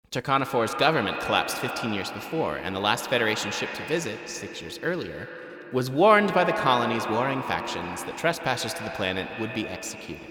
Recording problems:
echo of what is said; strong; throughout; 130 ms later, 7 dB below the speech

